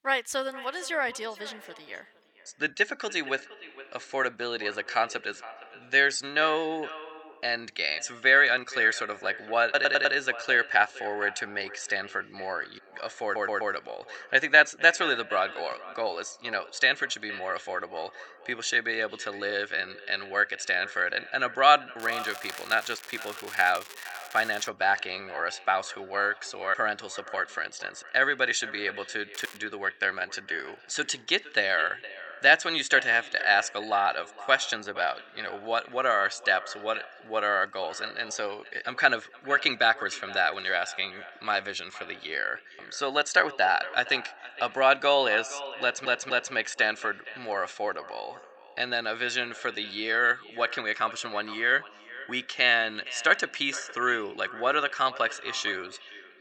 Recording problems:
echo of what is said; noticeable; throughout; 460 ms later, 15 dB below the speech
thin; somewhat; fading below 1 kHz
crackling; noticeable; from 22 to 25 s and at 29 s; 15 dB below the speech
audio stuttering; at 10 s, at 13 s and at 46 s

